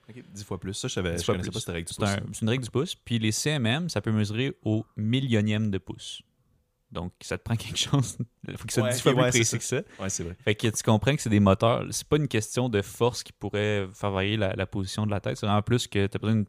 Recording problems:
none

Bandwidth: 15 kHz